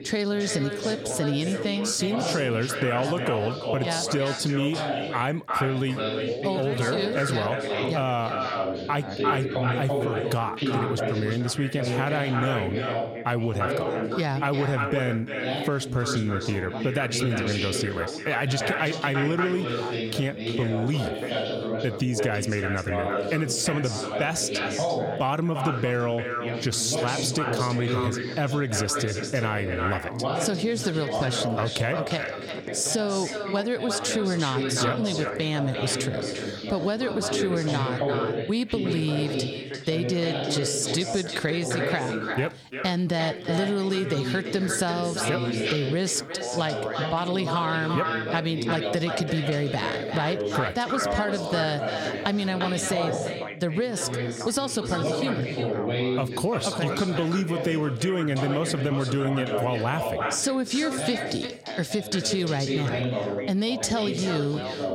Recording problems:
echo of what is said; strong; throughout; 350 ms later, 7 dB below the speech
squashed, flat; somewhat, background pumping
background chatter; loud; throughout; 2 voices, 4 dB below the speech

